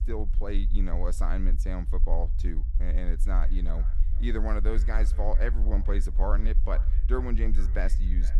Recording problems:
echo of what is said; faint; from 3 s on; 450 ms later, 20 dB below the speech
low rumble; noticeable; throughout; 15 dB below the speech

